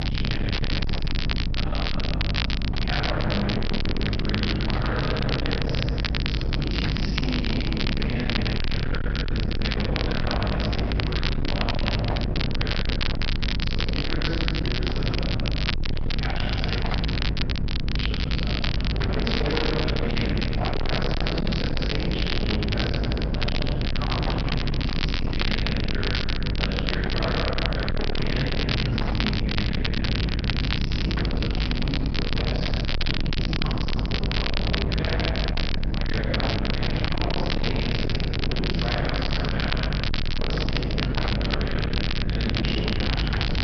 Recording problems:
distortion; heavy; 52% of the sound clipped
room echo; strong; dies away in 3 s
off-mic speech; far
high frequencies cut off; noticeable; nothing above 5.5 kHz
electrical hum; loud; throughout; 50 Hz, 4 dB below the speech
crackle, like an old record; loud; 3 dB below the speech

